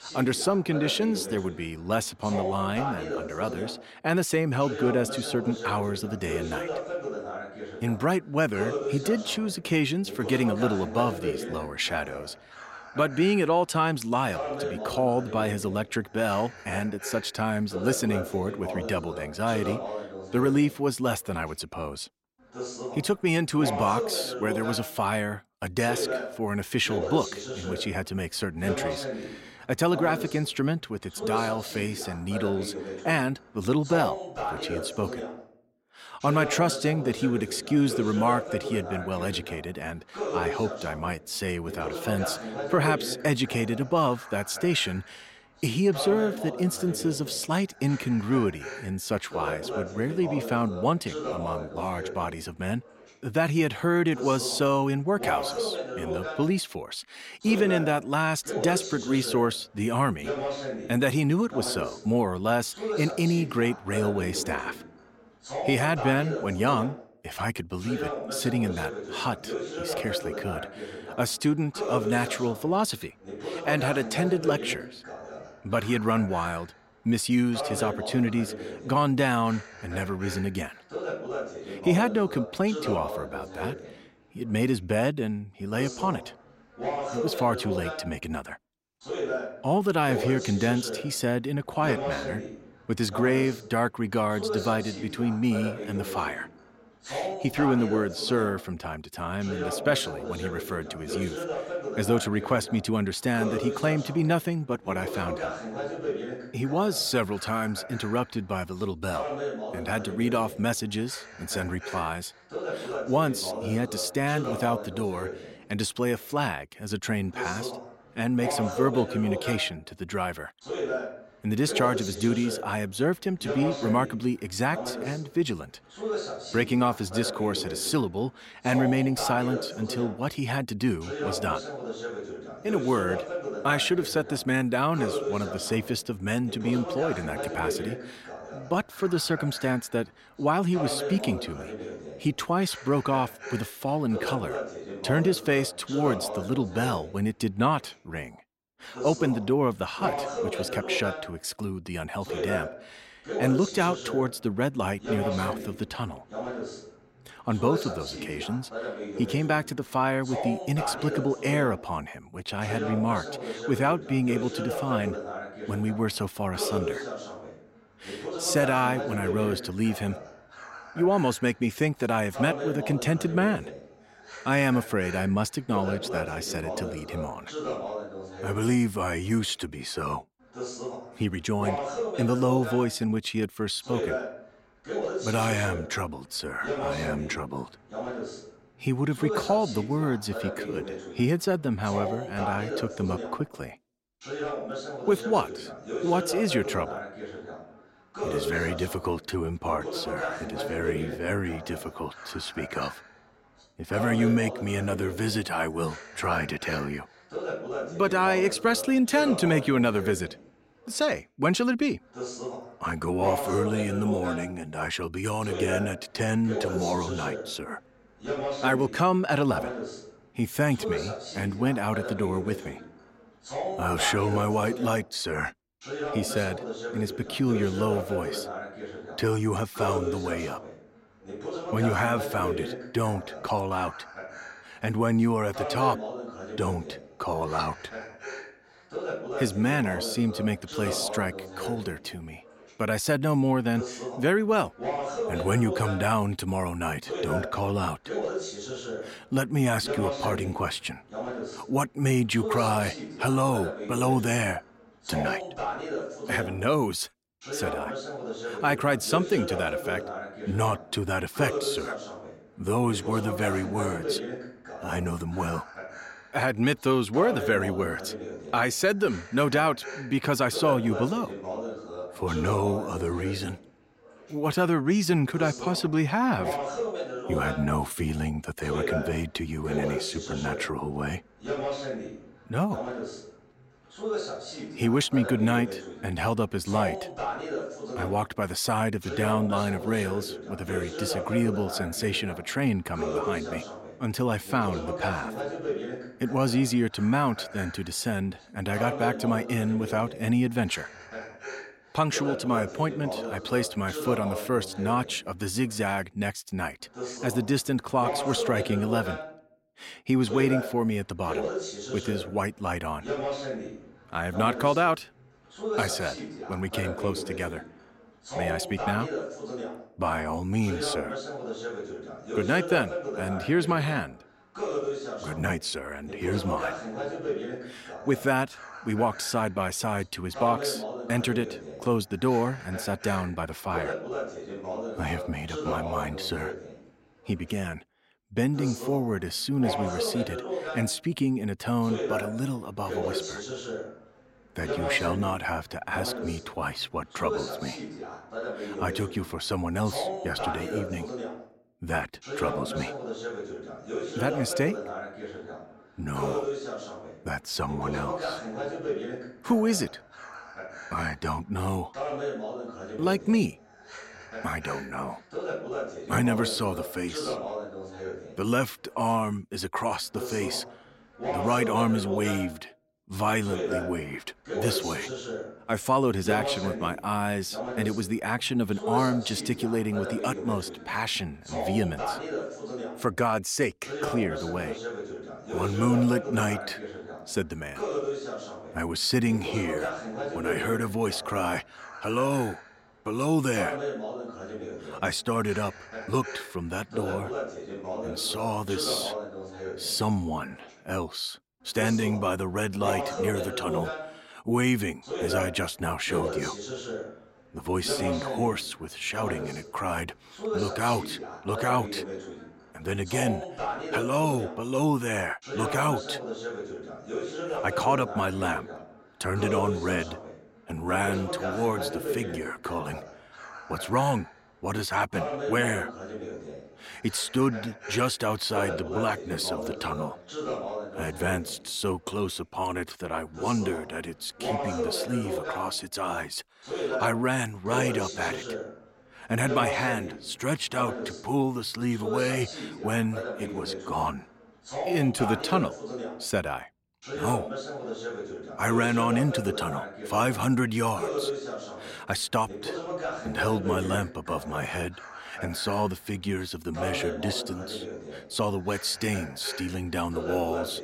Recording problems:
voice in the background; loud; throughout; 7 dB below the speech

